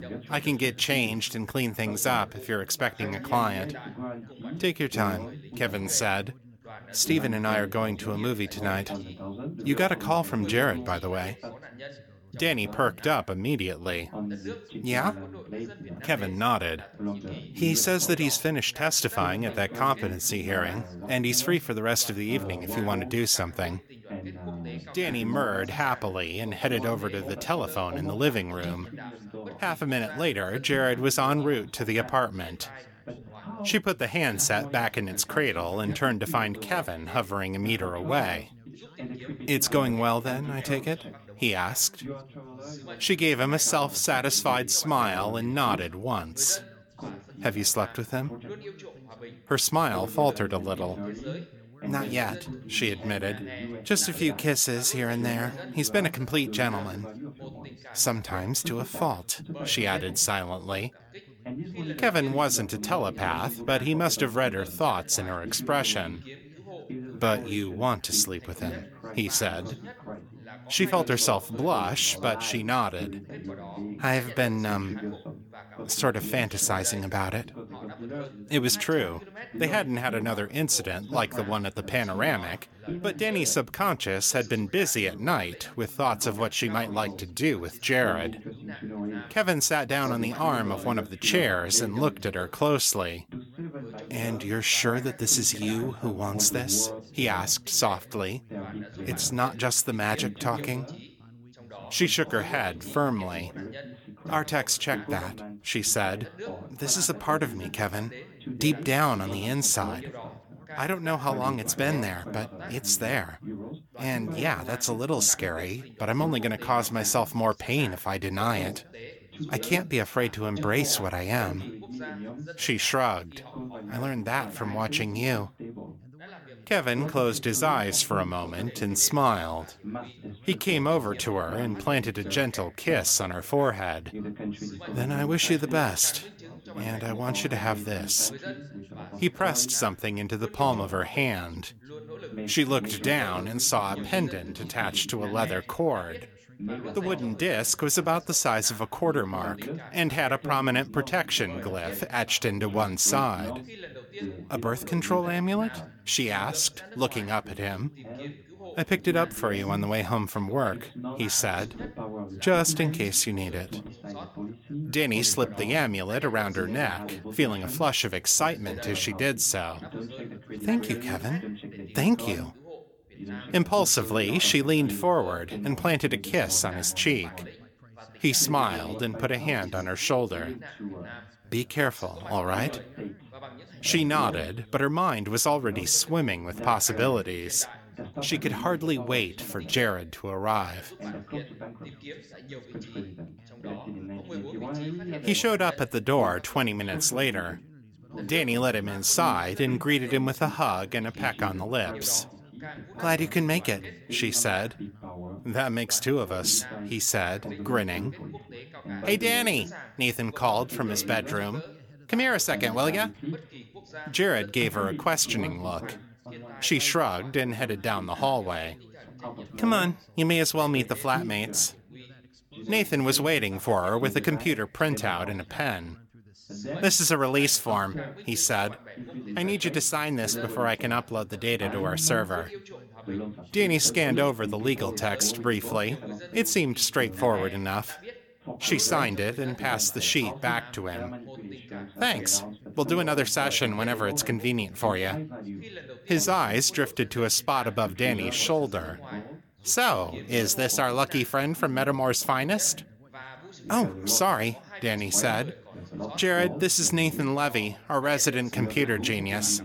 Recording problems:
background chatter; noticeable; throughout; 3 voices, 15 dB below the speech

